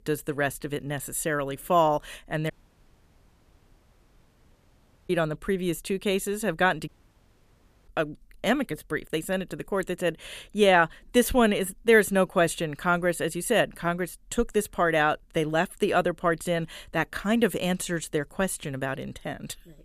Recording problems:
audio cutting out; at 2.5 s for 2.5 s and at 7 s for 1 s

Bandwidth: 14.5 kHz